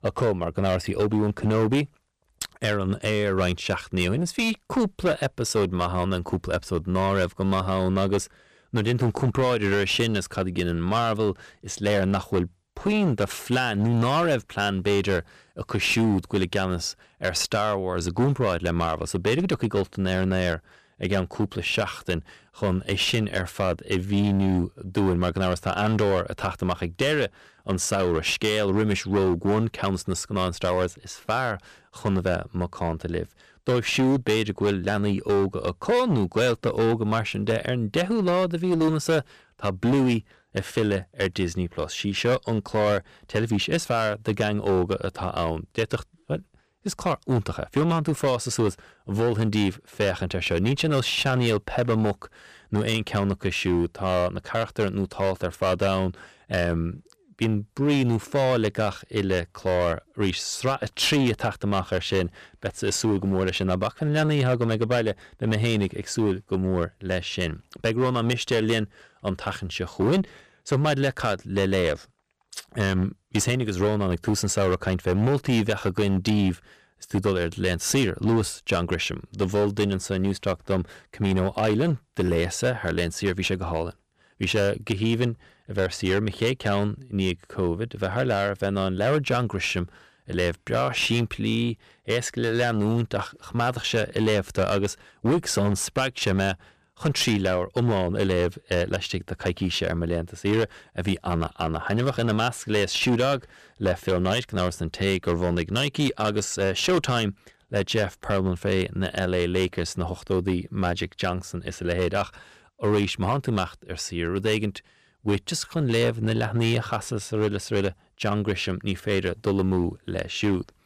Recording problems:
distortion; slight; 10% of the sound clipped

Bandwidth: 14.5 kHz